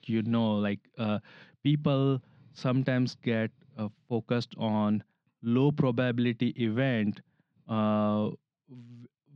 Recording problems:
muffled; slightly; fading above 3.5 kHz

